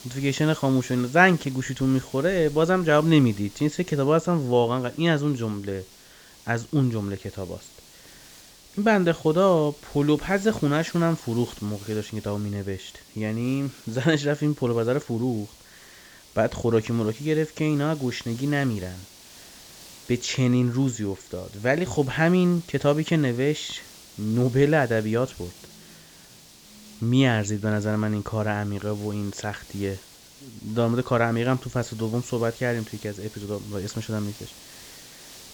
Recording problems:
high frequencies cut off; noticeable; nothing above 7.5 kHz
hiss; faint; throughout; 20 dB below the speech

